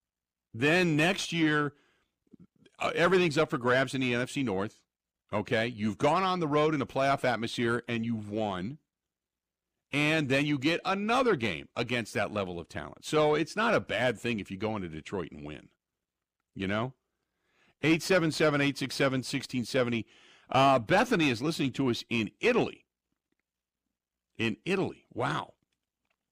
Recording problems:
distortion; slight; 10 dB below the speech

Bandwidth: 15 kHz